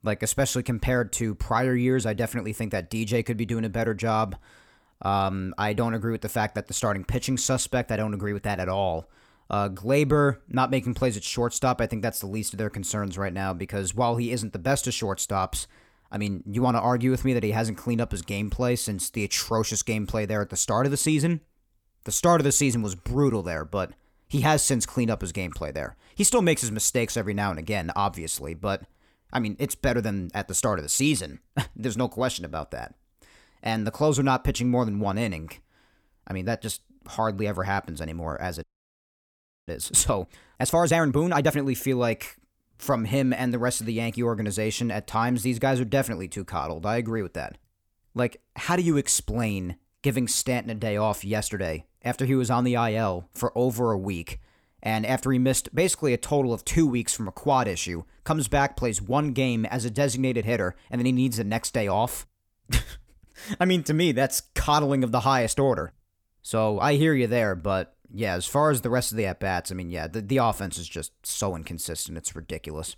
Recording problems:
audio freezing; at 39 s for 1 s

